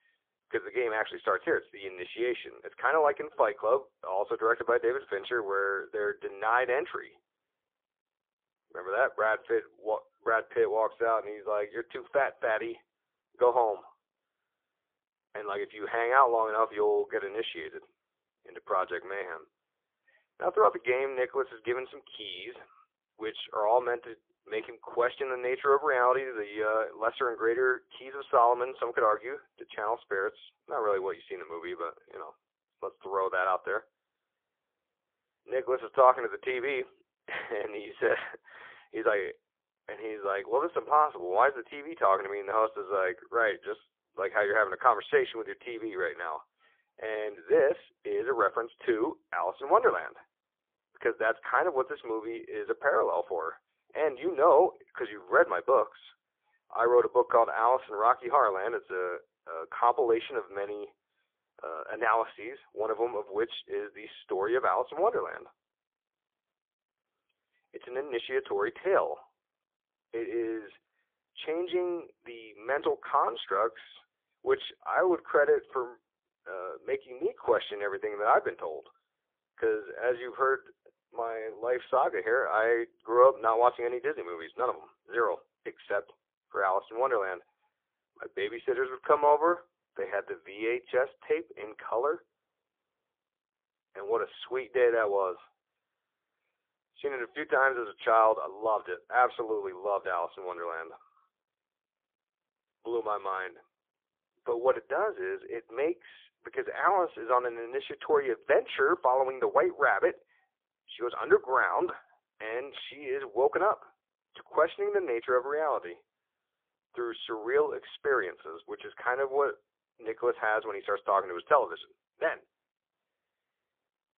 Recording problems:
phone-call audio; poor line; nothing above 3.5 kHz

